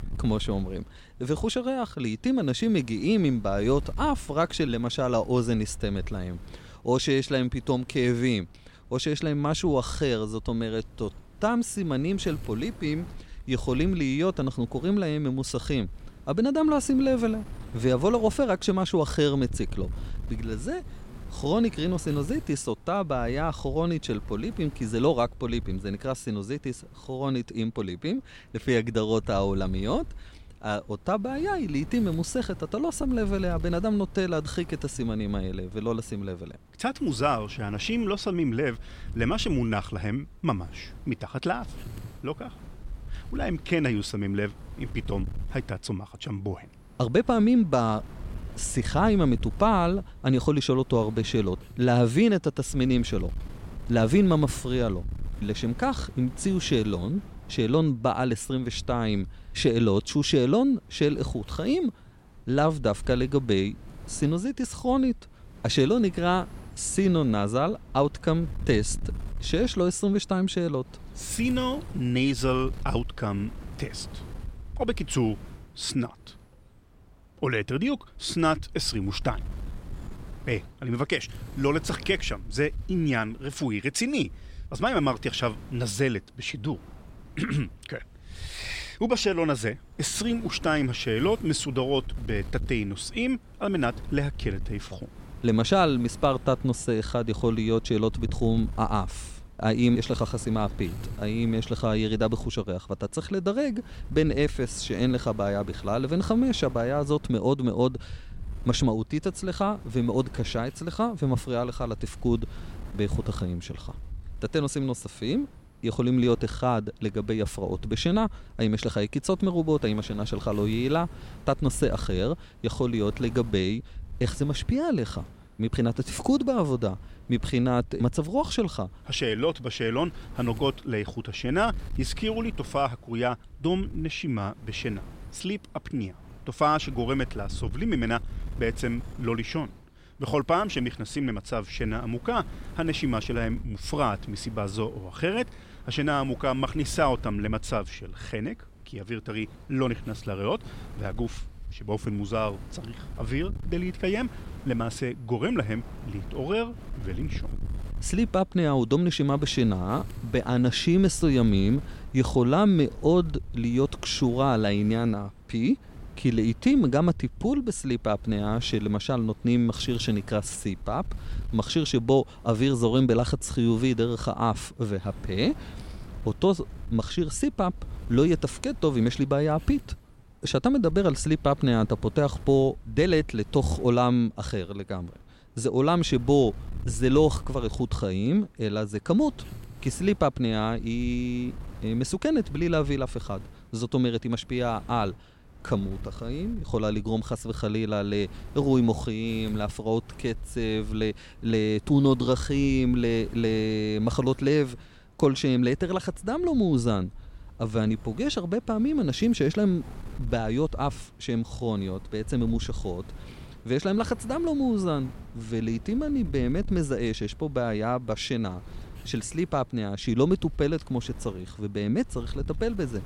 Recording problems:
wind noise on the microphone; occasional gusts; 25 dB below the speech

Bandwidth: 16 kHz